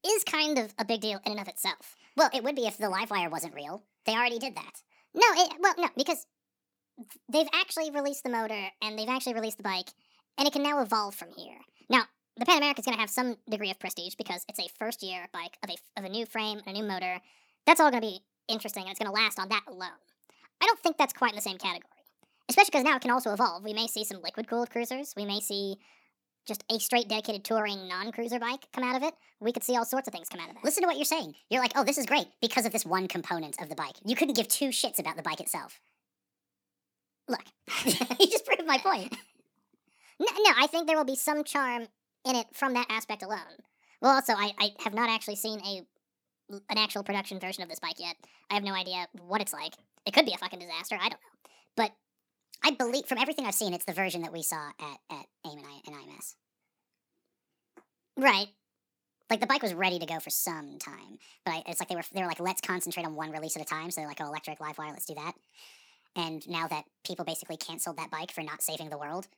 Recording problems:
wrong speed and pitch; too fast and too high; 1.6 times normal speed

